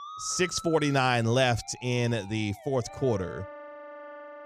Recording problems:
background music; noticeable; throughout; 15 dB below the speech

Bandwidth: 15 kHz